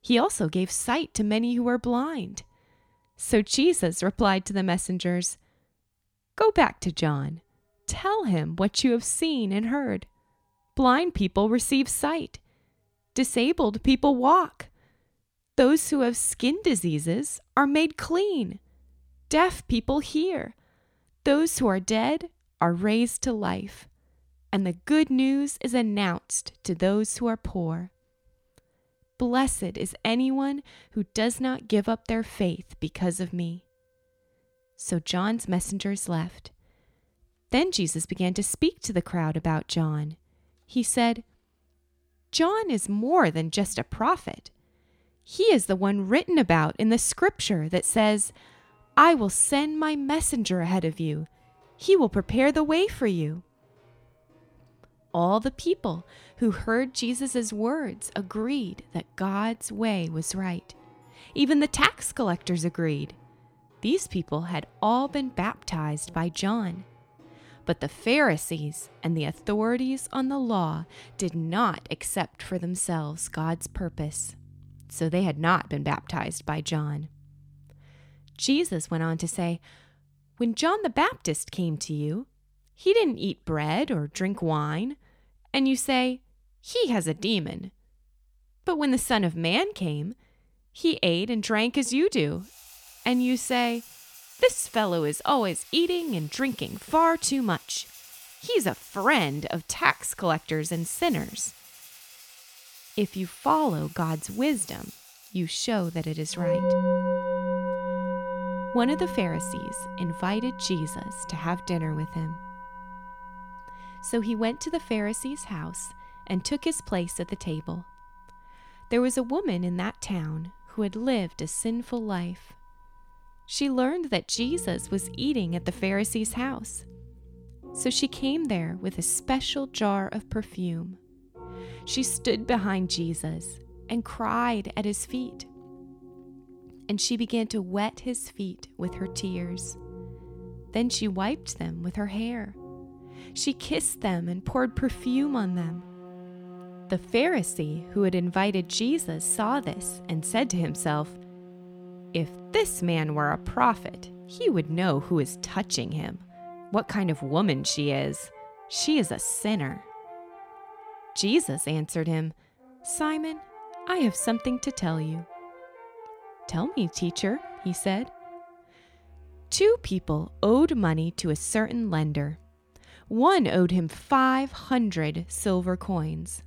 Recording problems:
background music; noticeable; throughout; 15 dB below the speech

